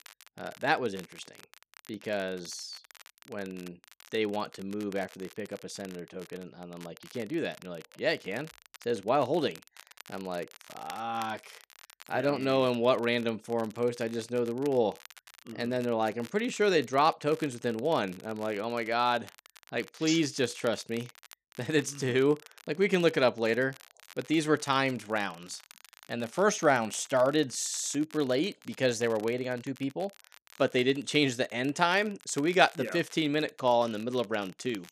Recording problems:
crackle, like an old record; faint; 25 dB below the speech

